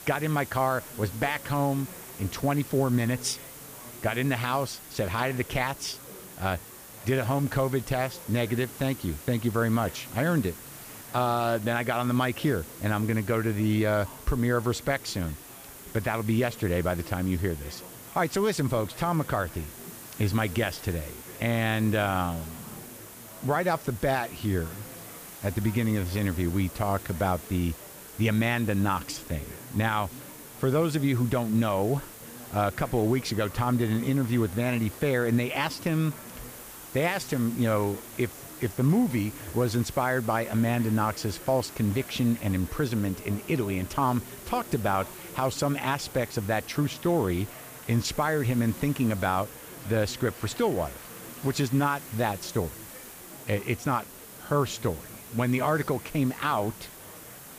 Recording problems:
hiss; noticeable; throughout; 15 dB below the speech
murmuring crowd; faint; throughout; 20 dB below the speech

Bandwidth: 15 kHz